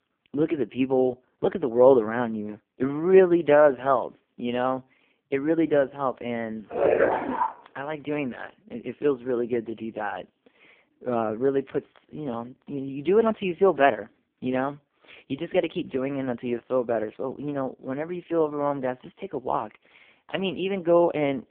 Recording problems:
phone-call audio; poor line; nothing above 3.5 kHz
dog barking; loud; at 6.5 s; peak 3 dB above the speech

